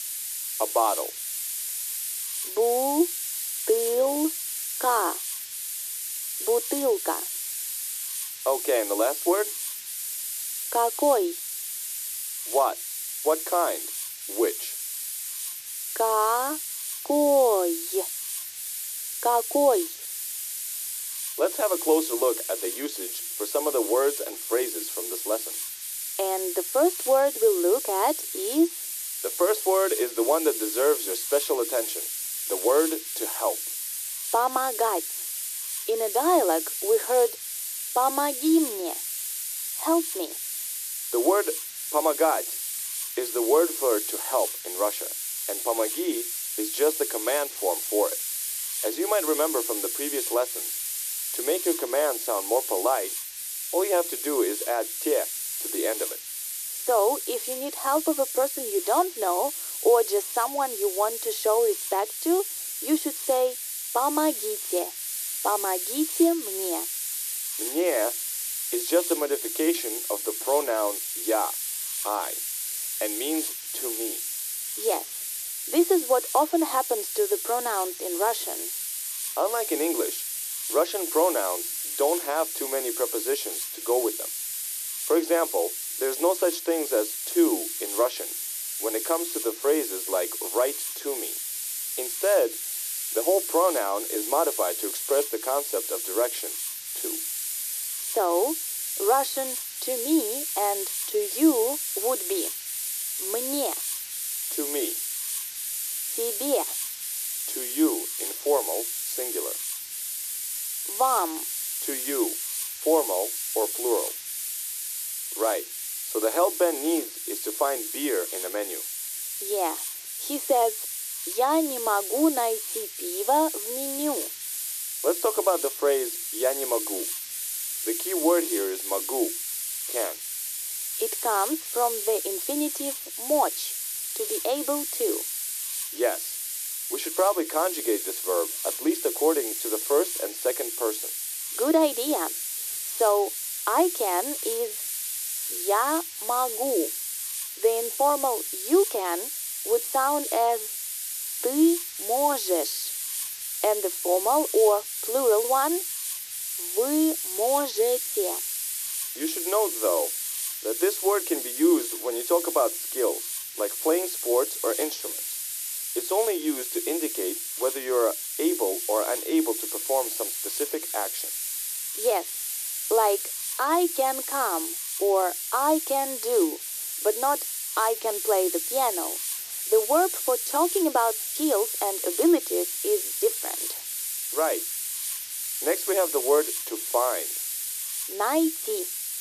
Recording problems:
thin; very; fading below 300 Hz
muffled; very slightly; fading above 1 kHz
hiss; loud; throughout; 3 dB below the speech

